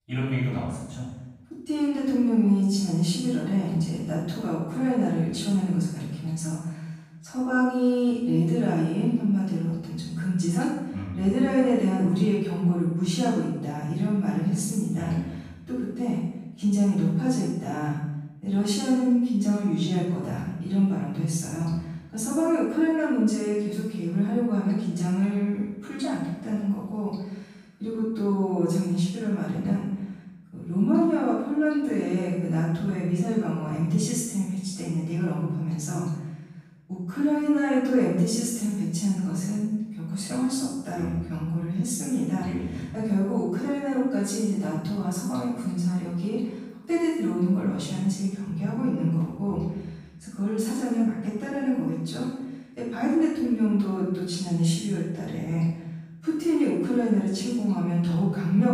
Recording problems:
room echo; strong; dies away in 0.9 s
off-mic speech; far

